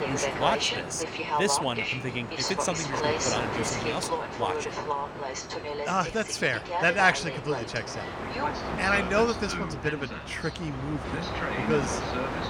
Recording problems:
train or aircraft noise; loud; throughout; 2 dB below the speech

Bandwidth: 17 kHz